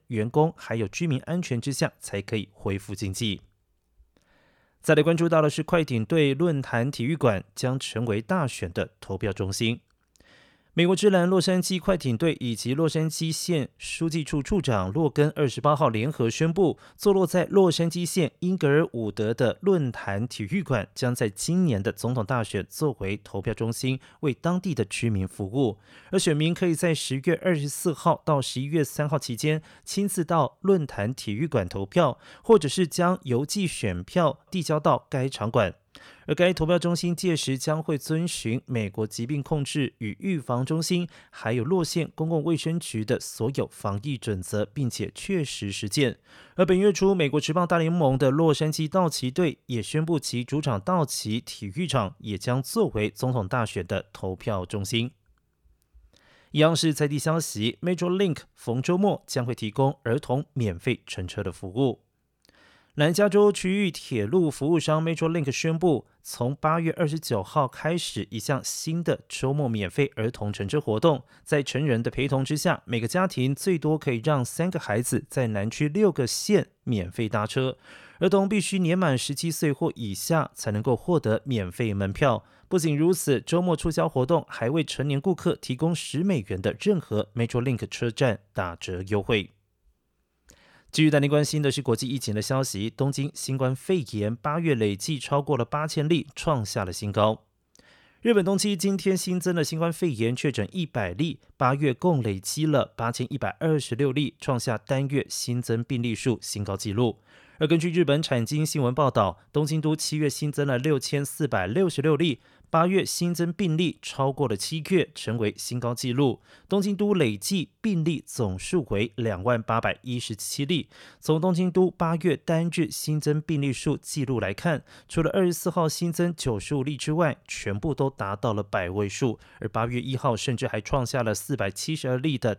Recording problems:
none

